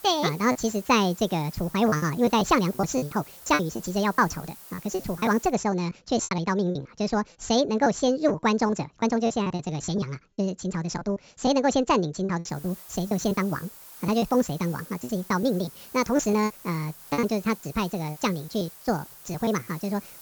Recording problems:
wrong speed and pitch; too fast and too high; 1.6 times normal speed
high frequencies cut off; noticeable; nothing above 8 kHz
hiss; noticeable; until 5.5 s and from 13 s on; 15 dB below the speech
choppy; very; 11% of the speech affected

